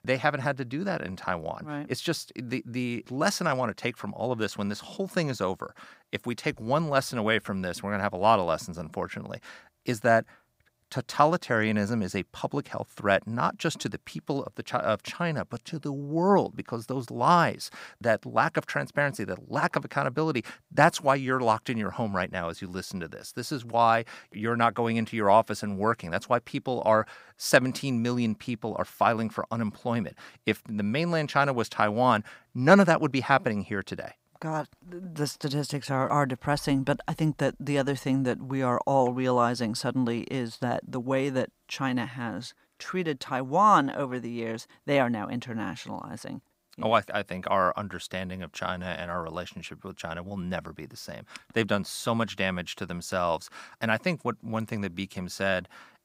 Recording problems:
none

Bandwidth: 15.5 kHz